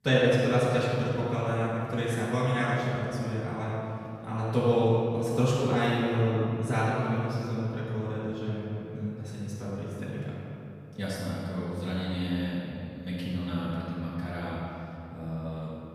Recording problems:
room echo; strong; dies away in 2.4 s
off-mic speech; far
echo of what is said; noticeable; throughout; 110 ms later, 15 dB below the speech

